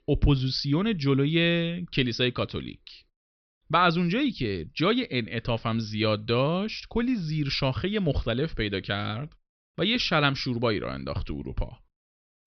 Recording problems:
high frequencies cut off; noticeable; nothing above 5.5 kHz

